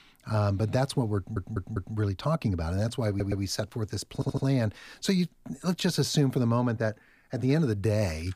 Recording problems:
audio stuttering; at 1 s, at 3 s and at 4 s

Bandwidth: 15 kHz